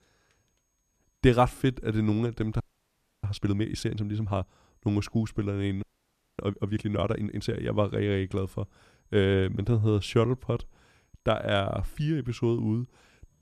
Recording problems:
audio freezing; at 2.5 s for 0.5 s and at 6 s for 0.5 s

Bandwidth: 14.5 kHz